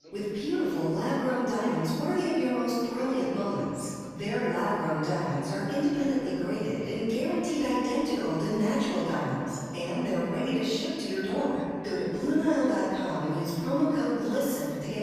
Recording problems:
room echo; strong; dies away in 2.2 s
off-mic speech; far
background chatter; faint; throughout; 4 voices, 20 dB below the speech

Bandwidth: 14.5 kHz